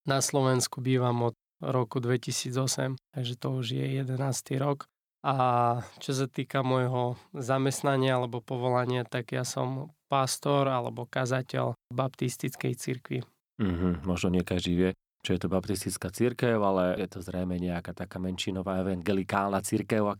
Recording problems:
none

